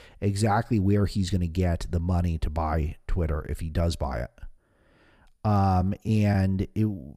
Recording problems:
none

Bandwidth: 14.5 kHz